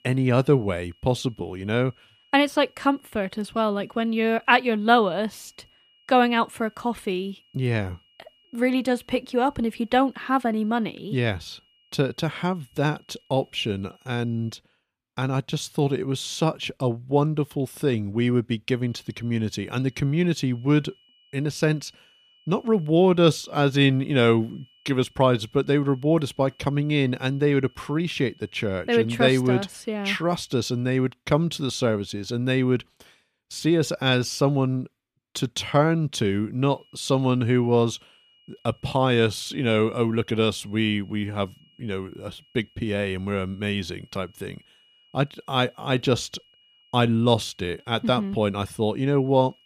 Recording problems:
high-pitched whine; faint; until 15 s, from 19 to 31 s and from 37 s on; 3 kHz, 35 dB below the speech

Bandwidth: 15 kHz